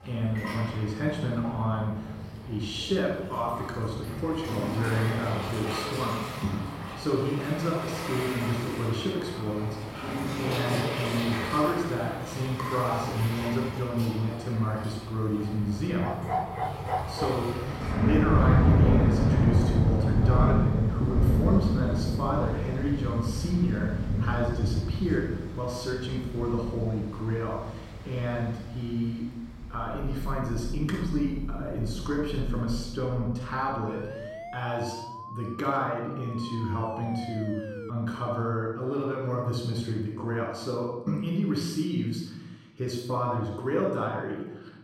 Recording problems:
off-mic speech; far
room echo; noticeable; dies away in 1 s
rain or running water; very loud; until 33 s; as loud as the speech
dog barking; loud; from 16 to 17 s; peak level with the speech
siren; noticeable; from 34 to 38 s; peak 9 dB below the speech

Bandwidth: 16 kHz